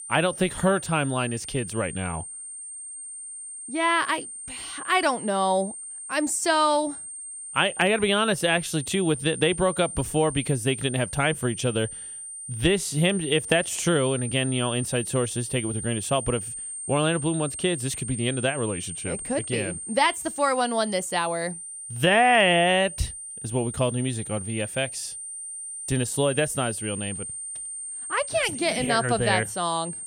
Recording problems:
high-pitched whine; loud; throughout; 8.5 kHz, 9 dB below the speech

